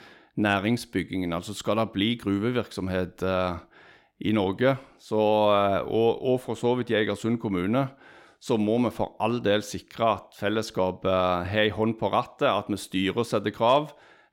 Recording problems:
none

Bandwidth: 16.5 kHz